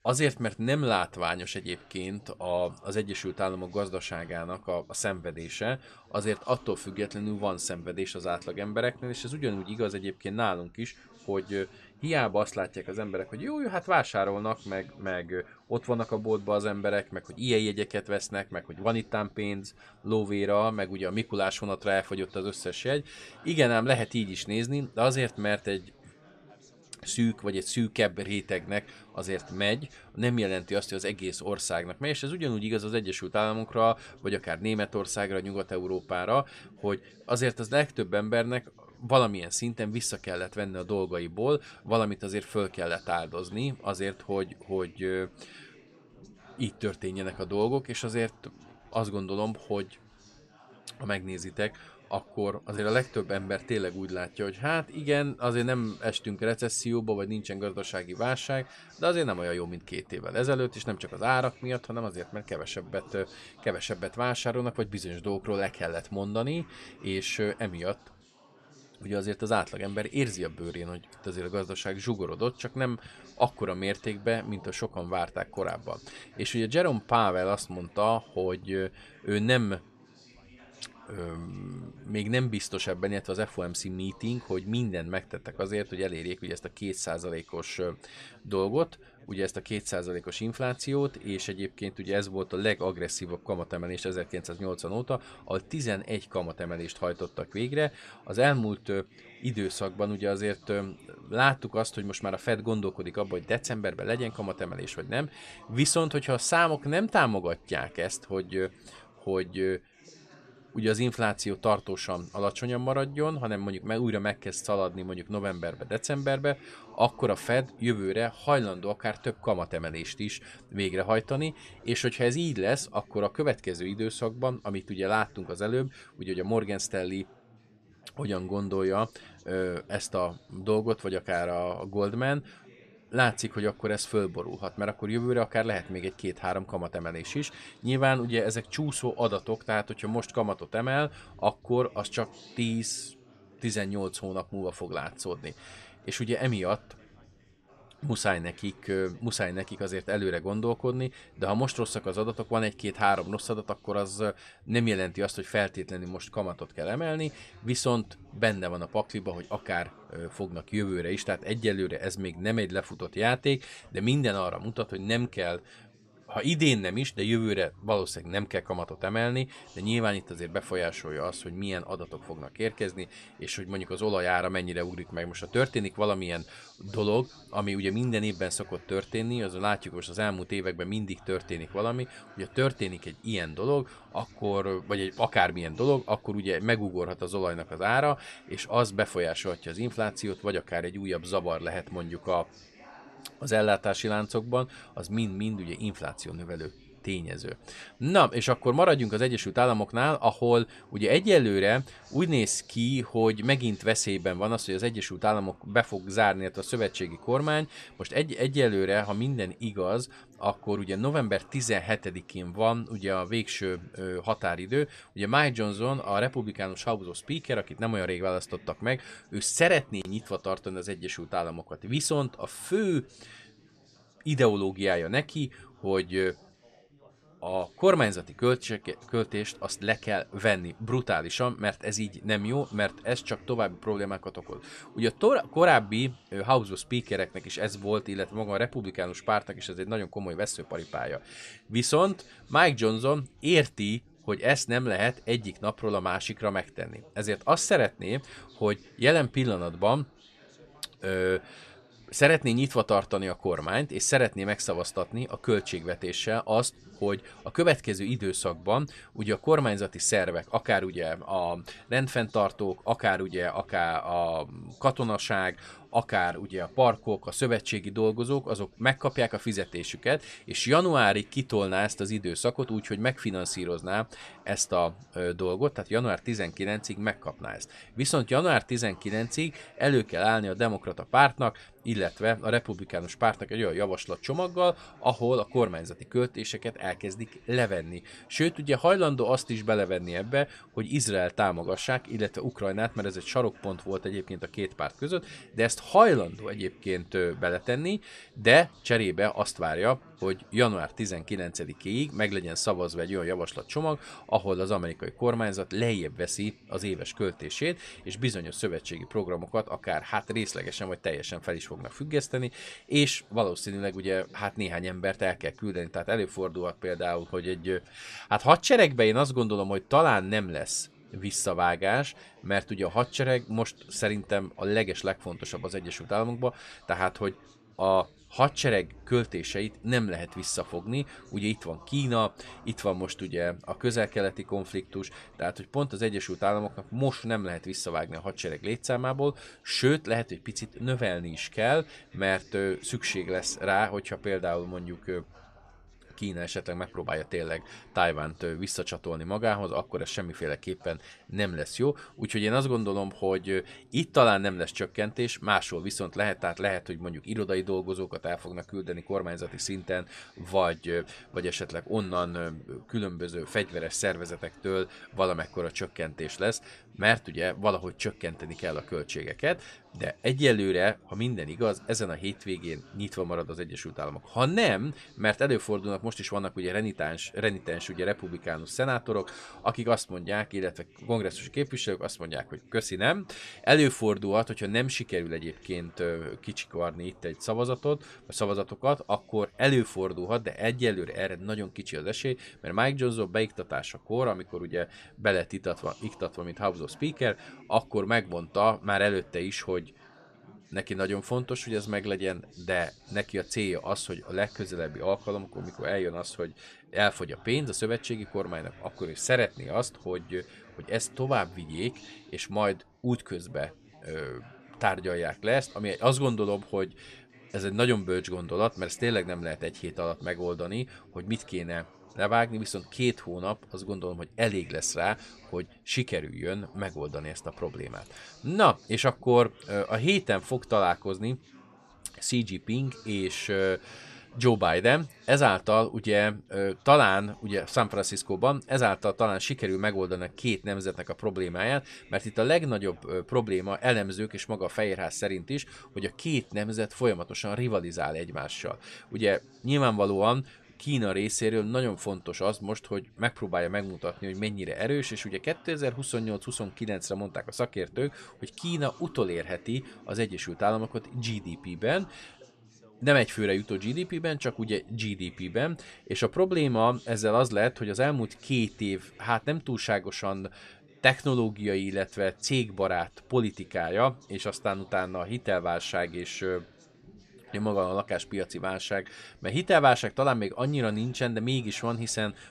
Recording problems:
background chatter; faint; throughout; 4 voices, 25 dB below the speech

